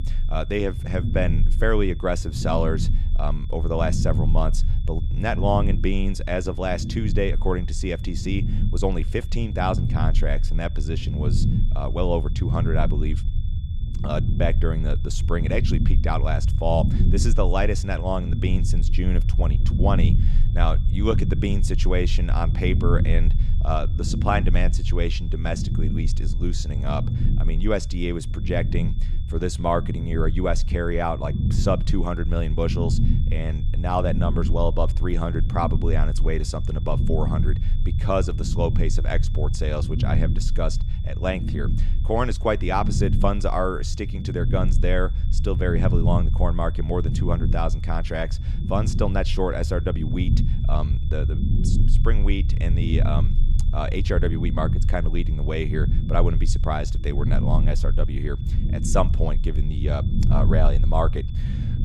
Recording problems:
low rumble; noticeable; throughout; 10 dB below the speech
high-pitched whine; faint; throughout; 3.5 kHz, 25 dB below the speech

